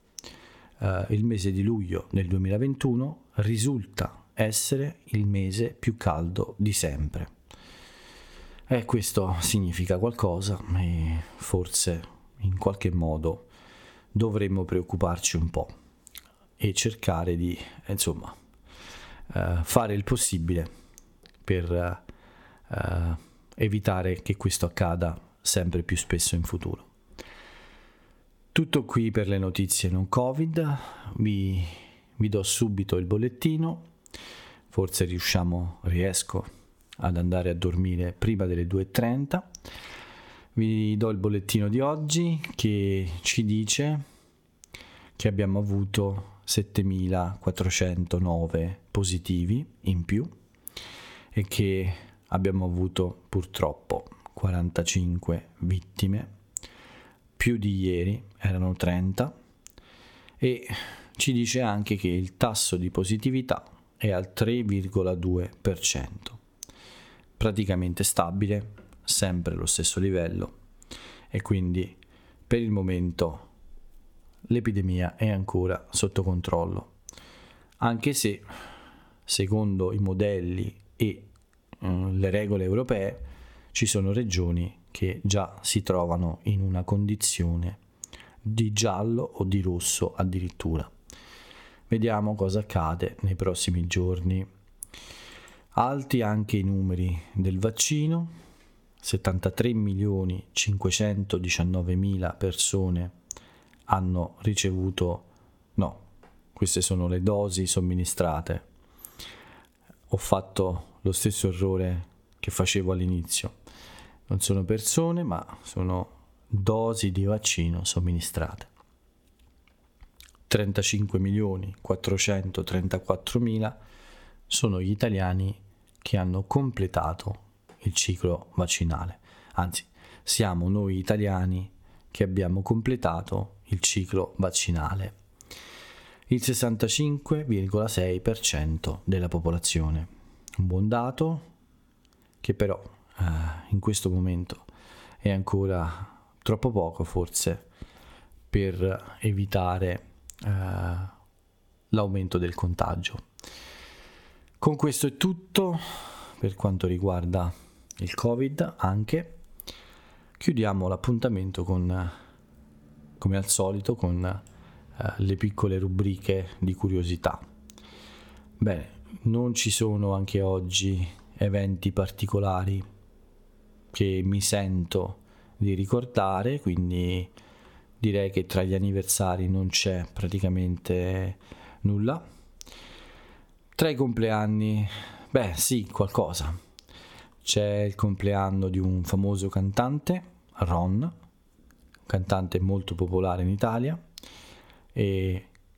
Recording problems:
squashed, flat; somewhat

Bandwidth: 17.5 kHz